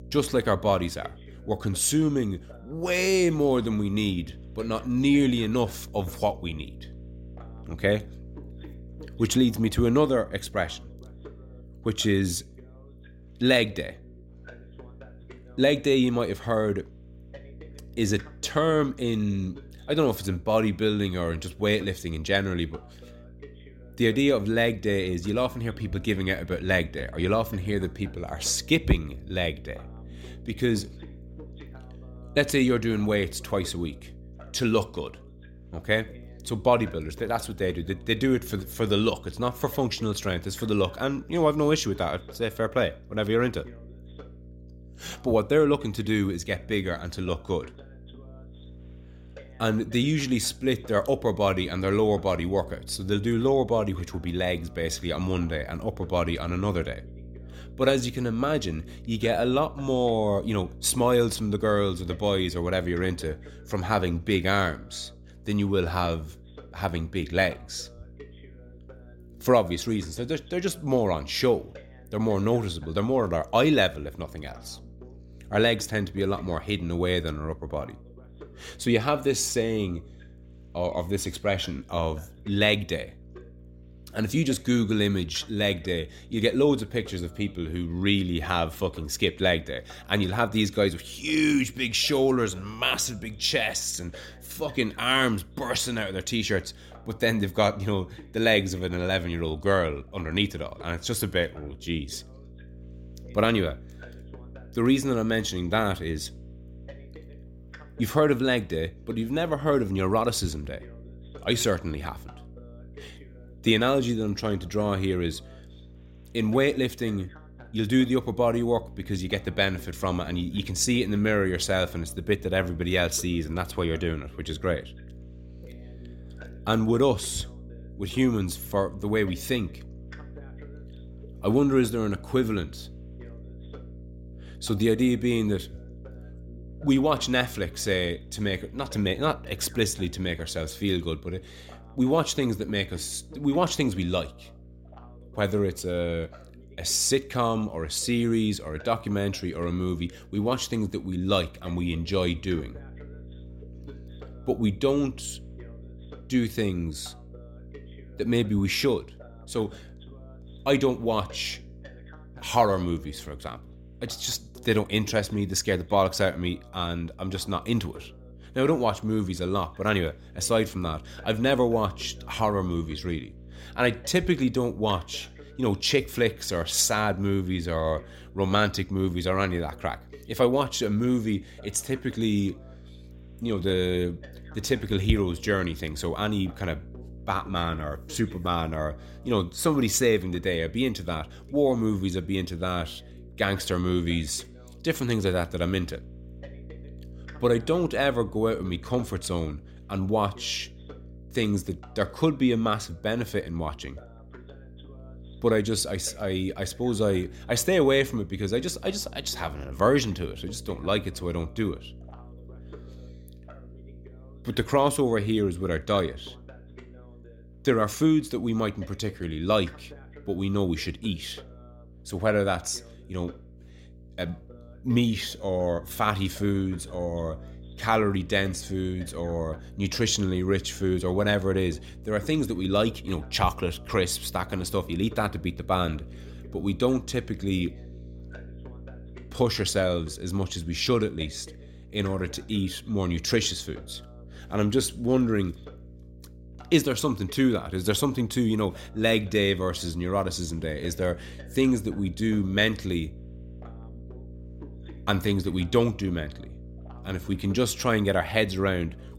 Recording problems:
electrical hum; faint; throughout; 60 Hz, 30 dB below the speech
voice in the background; faint; throughout; 25 dB below the speech

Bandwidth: 16 kHz